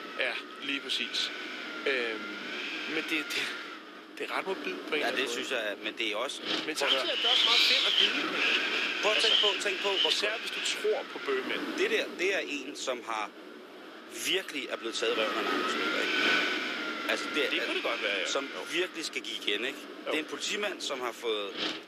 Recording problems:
thin; somewhat; fading below 350 Hz
wind noise on the microphone; heavy; 3 dB above the speech

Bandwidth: 14.5 kHz